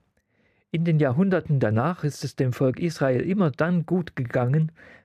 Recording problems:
muffled; slightly; fading above 2.5 kHz

